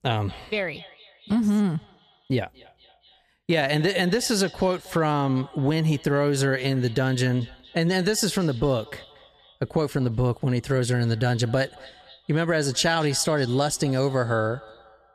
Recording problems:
echo of what is said; faint; throughout; 230 ms later, 20 dB below the speech

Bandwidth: 14.5 kHz